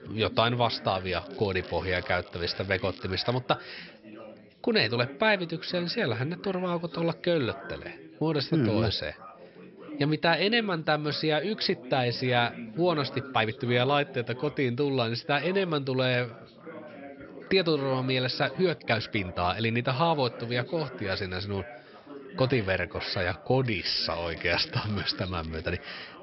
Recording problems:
high frequencies cut off; noticeable; nothing above 5.5 kHz
chatter from many people; noticeable; throughout; 15 dB below the speech
crackling; faint; from 1 to 3.5 s and from 24 to 26 s; 20 dB below the speech
uneven, jittery; strongly; from 8.5 to 24 s

